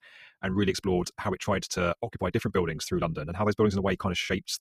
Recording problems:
wrong speed, natural pitch; too fast; 1.5 times normal speed

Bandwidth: 14.5 kHz